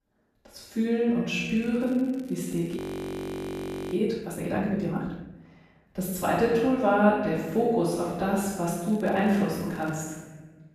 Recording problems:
room echo; strong; dies away in 1.2 s
off-mic speech; far
crackling; faint; from 1.5 to 4 s and from 8.5 to 10 s; 30 dB below the speech
audio freezing; at 3 s for 1 s

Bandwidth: 14.5 kHz